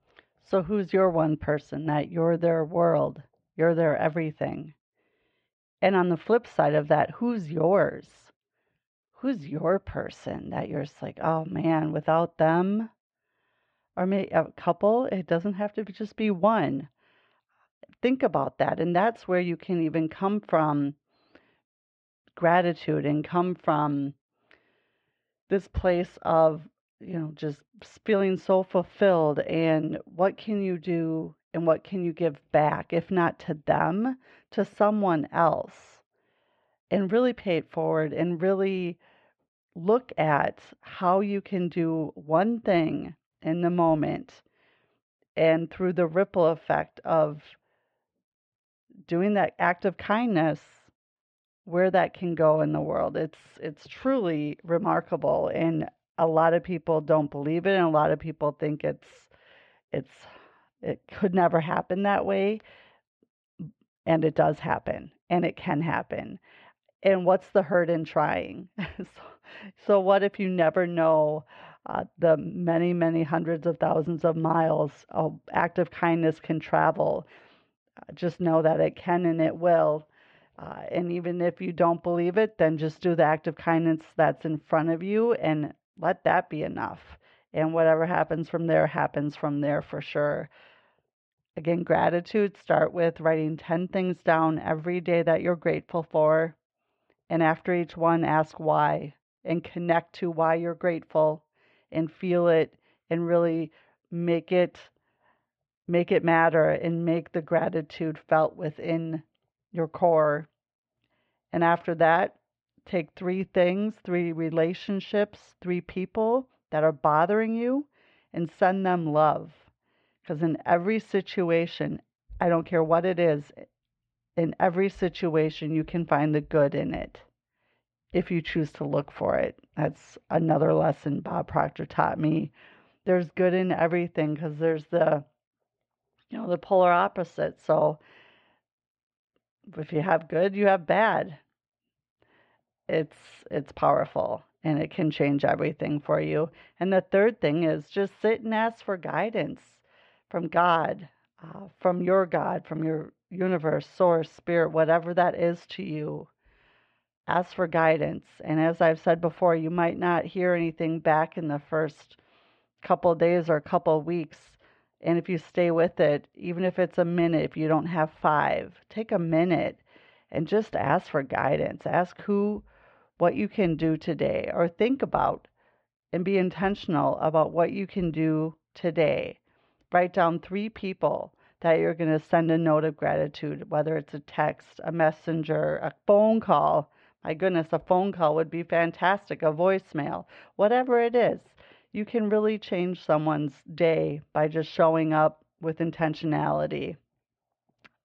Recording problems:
muffled; very; fading above 3 kHz

